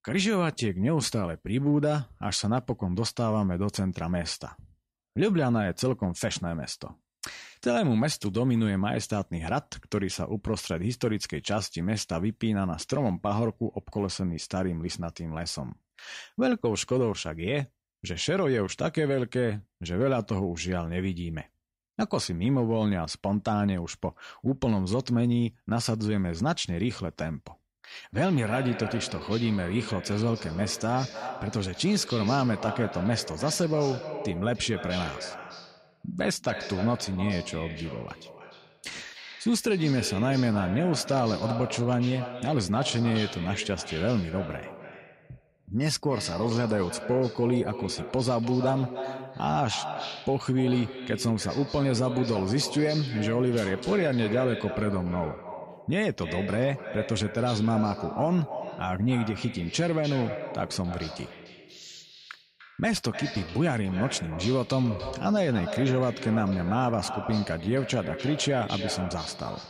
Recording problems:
echo of what is said; strong; from 28 s on; 300 ms later, 9 dB below the speech

